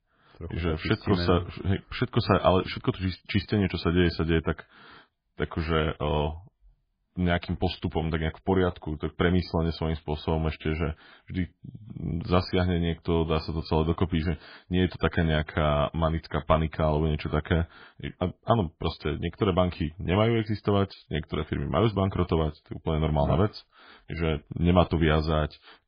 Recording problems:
garbled, watery; badly; nothing above 4.5 kHz

